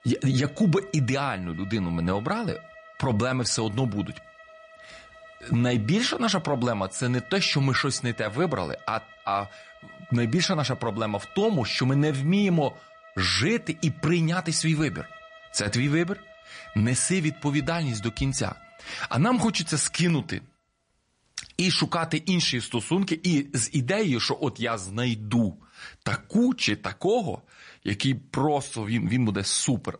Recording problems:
garbled, watery; slightly; nothing above 10 kHz
background music; faint; until 20 s; 20 dB below the speech

